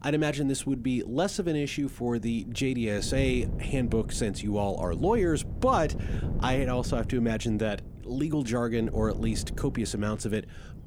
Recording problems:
wind noise on the microphone; occasional gusts; 15 dB below the speech

